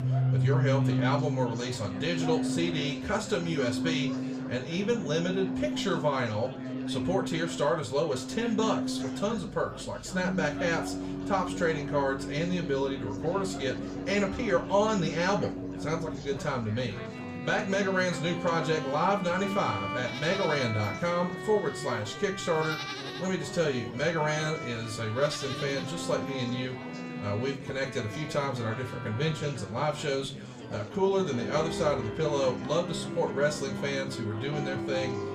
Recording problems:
off-mic speech; far
room echo; very slight; dies away in 0.3 s
background music; loud; throughout; 5 dB below the speech
animal sounds; noticeable; throughout; 15 dB below the speech
chatter from many people; noticeable; throughout; 10 dB below the speech

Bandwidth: 15 kHz